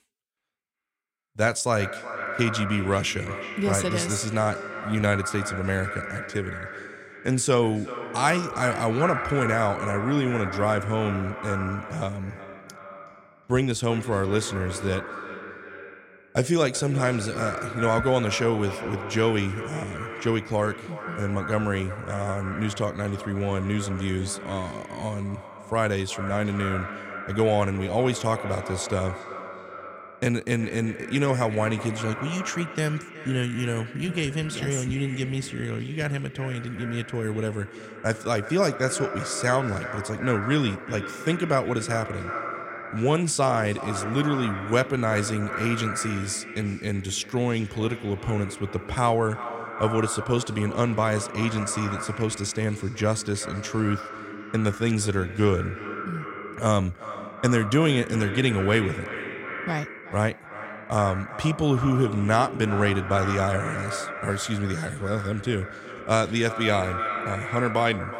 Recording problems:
echo of what is said; strong; throughout; 370 ms later, 9 dB below the speech

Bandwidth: 16 kHz